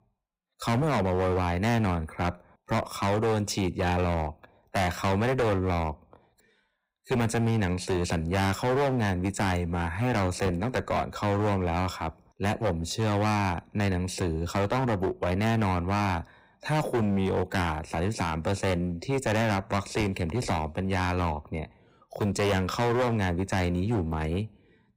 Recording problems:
distortion; heavy; 18% of the sound clipped

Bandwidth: 15.5 kHz